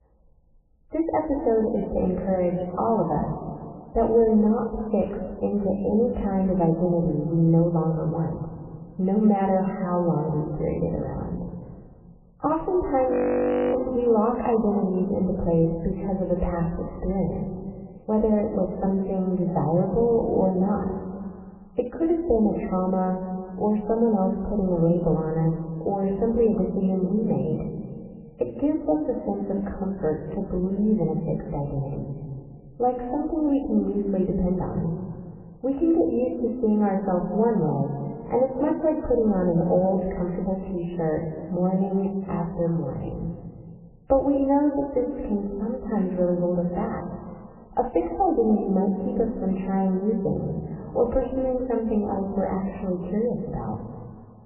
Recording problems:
off-mic speech; far
garbled, watery; badly; nothing above 2.5 kHz
room echo; noticeable; dies away in 2 s
muffled; very slightly; fading above 1 kHz
audio freezing; at 13 s for 0.5 s

